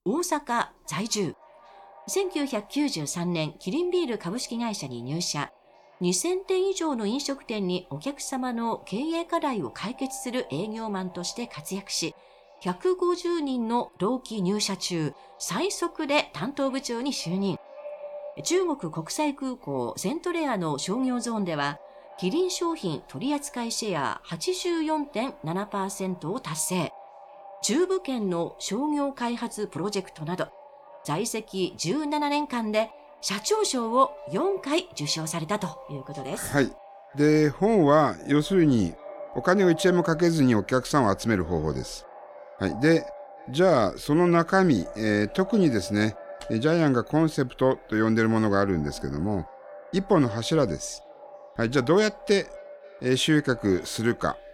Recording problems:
echo of what is said; faint; throughout; 530 ms later, 20 dB below the speech

